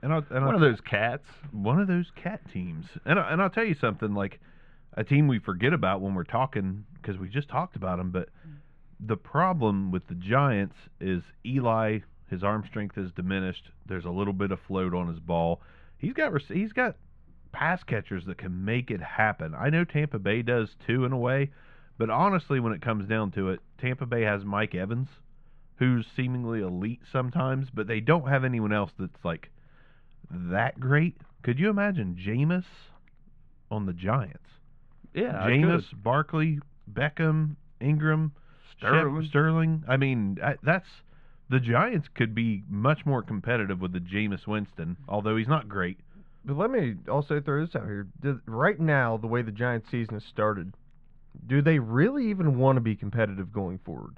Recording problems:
muffled; very; fading above 1.5 kHz

